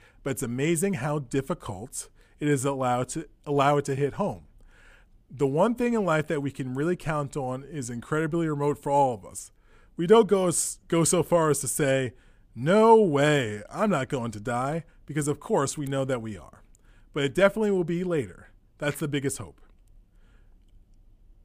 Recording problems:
none

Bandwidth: 15 kHz